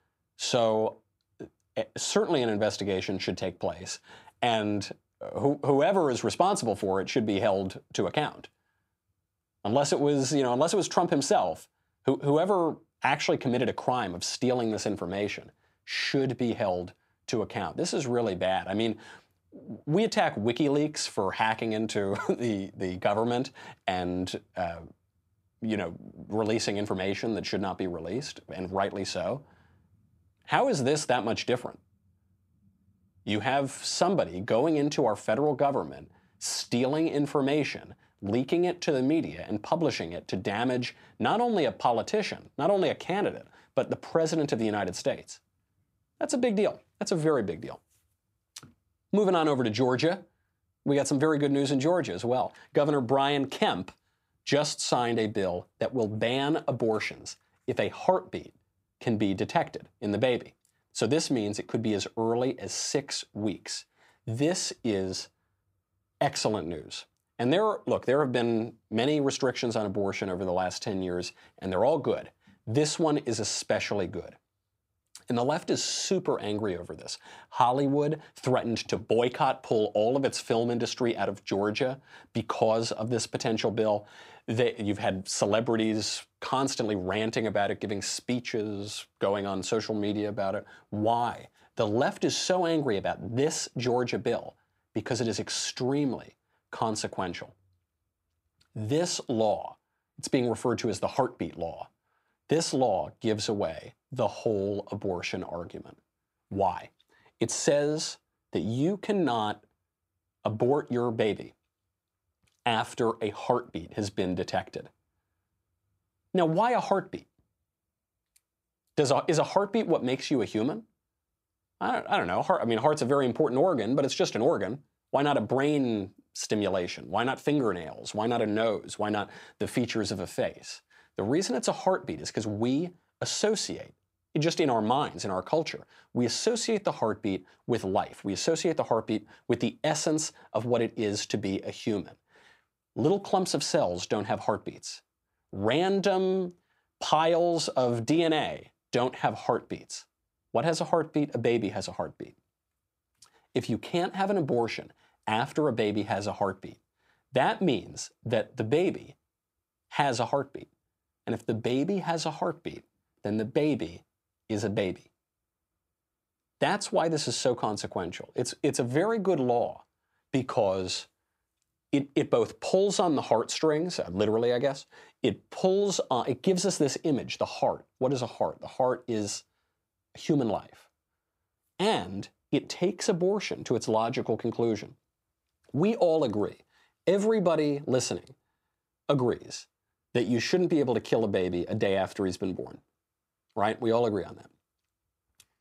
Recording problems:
none

